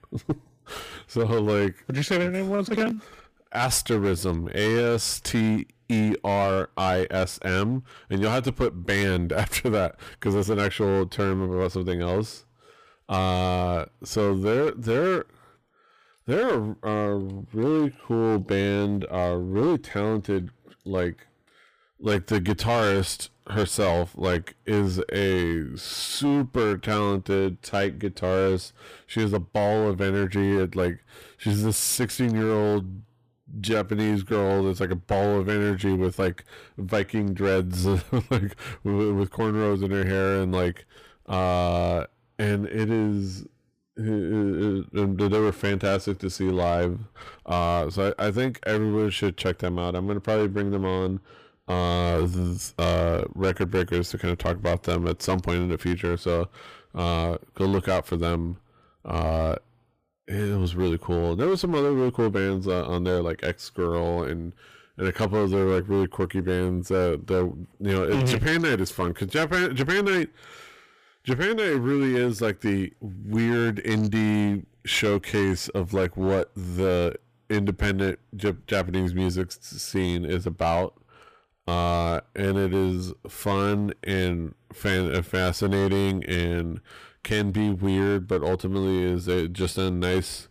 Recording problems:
distortion; slight; 11% of the sound clipped

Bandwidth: 15 kHz